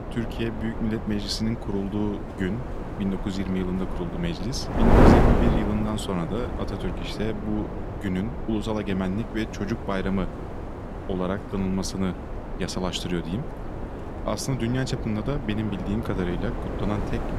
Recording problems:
wind noise on the microphone; heavy; as loud as the speech

